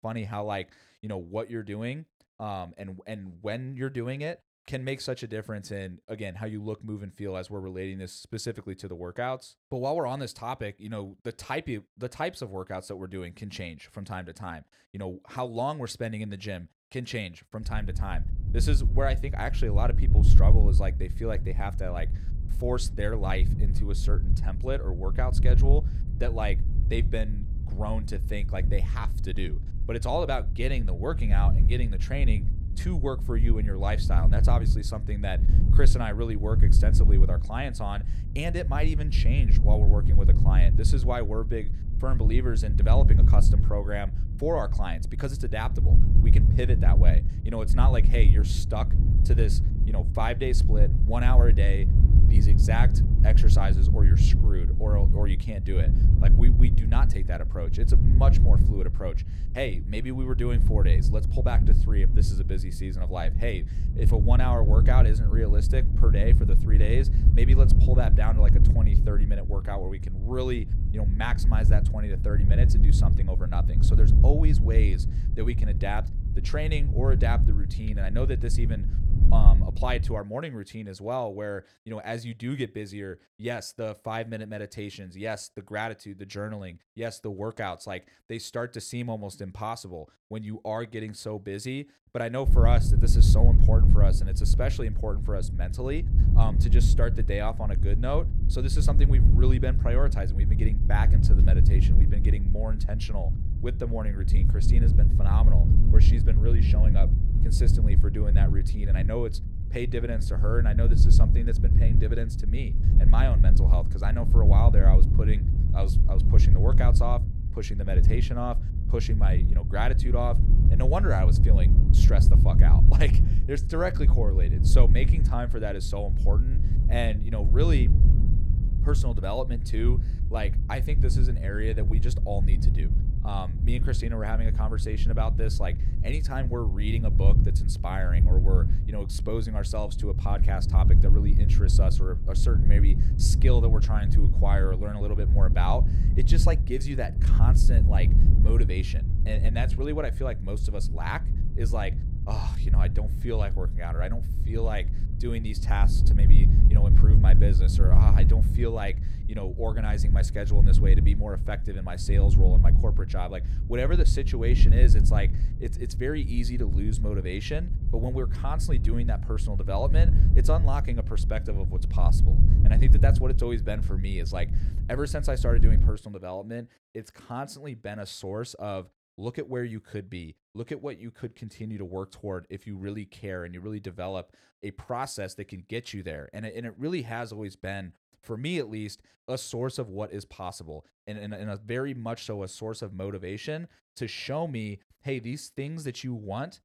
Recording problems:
wind noise on the microphone; heavy; from 18 s to 1:20 and from 1:32 to 2:56; 6 dB below the speech

